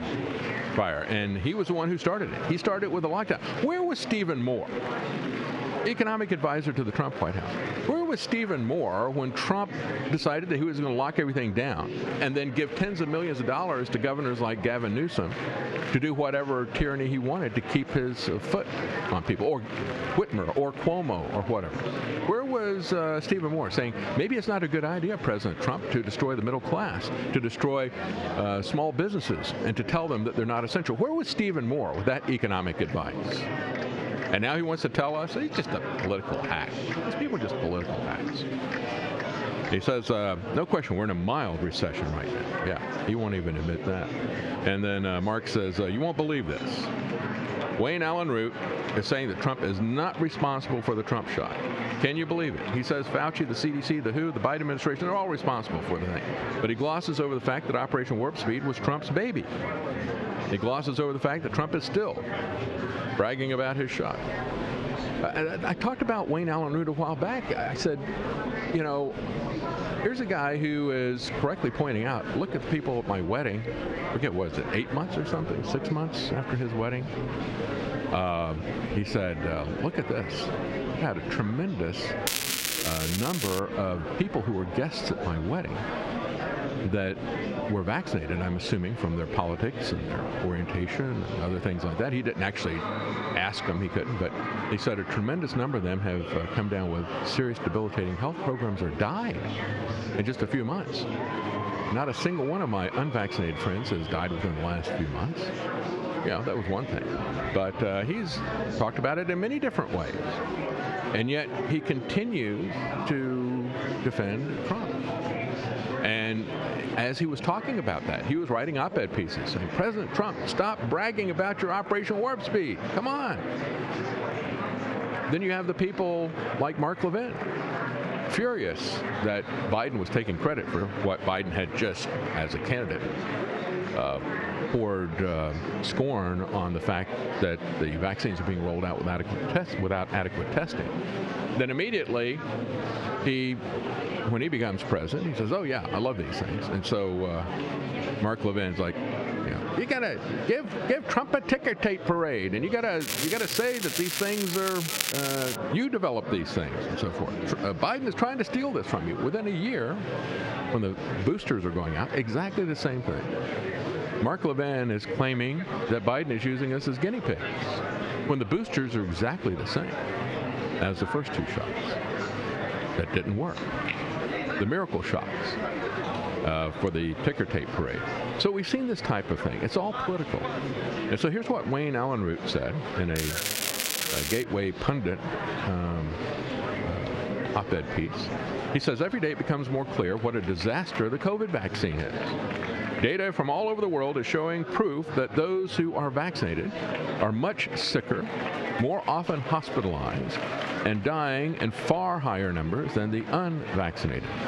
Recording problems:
squashed, flat; heavily, background pumping
muffled; very slightly; fading above 3 kHz
murmuring crowd; loud; throughout; 6 dB below the speech
crackling; loud; from 1:22 to 1:24, from 2:33 to 2:36 and from 3:03 to 3:04; as loud as the speech

